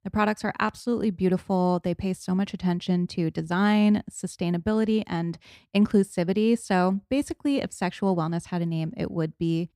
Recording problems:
none

